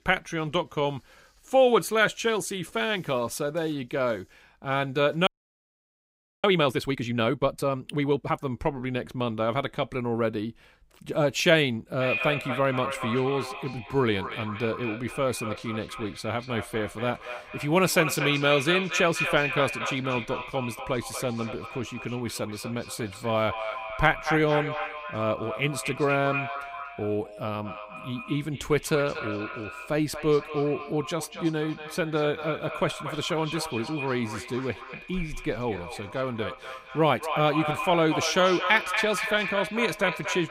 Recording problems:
echo of what is said; strong; from 12 s on; 240 ms later, 7 dB below the speech
audio freezing; at 5.5 s for 1 s

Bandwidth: 15.5 kHz